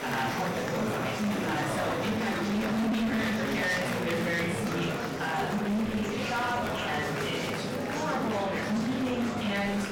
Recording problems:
off-mic speech; far
room echo; noticeable; dies away in 0.6 s
distortion; slight; 19% of the sound clipped
murmuring crowd; loud; throughout; 2 dB below the speech
crackling; faint; from 4 to 8.5 s; 25 dB below the speech
background music; very faint; until 3 s; 20 dB below the speech

